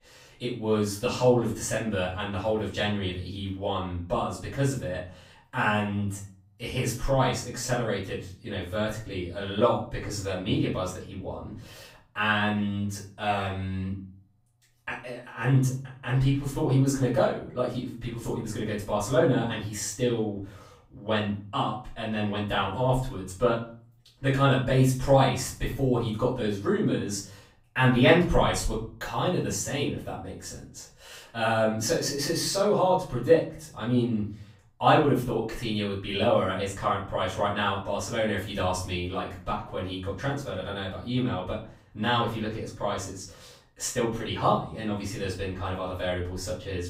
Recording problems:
off-mic speech; far
room echo; slight; dies away in 0.4 s

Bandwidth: 15.5 kHz